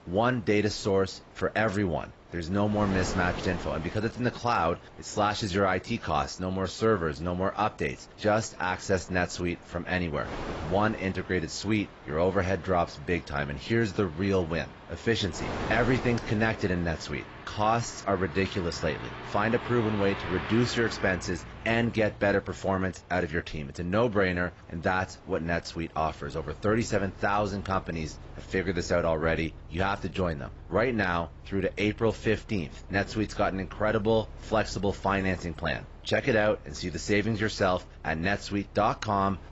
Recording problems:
garbled, watery; badly; nothing above 7.5 kHz
traffic noise; noticeable; throughout; 15 dB below the speech
wind noise on the microphone; occasional gusts; 15 dB below the speech

